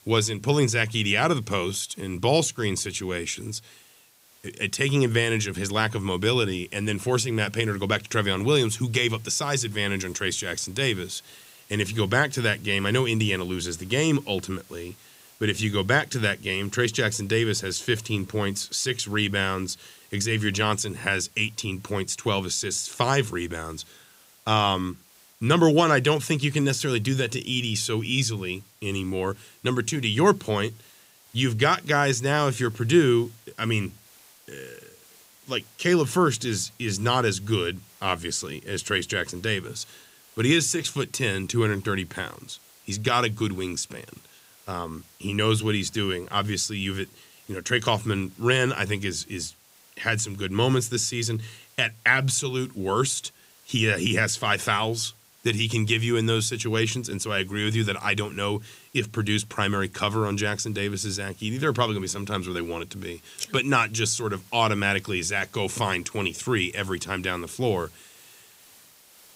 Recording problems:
hiss; faint; throughout; 25 dB below the speech

